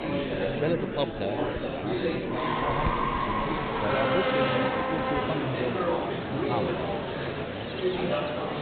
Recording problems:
high frequencies cut off; severe; nothing above 4 kHz
animal sounds; very loud; throughout; 2 dB above the speech
murmuring crowd; very loud; throughout; 5 dB above the speech
abrupt cut into speech; at the start

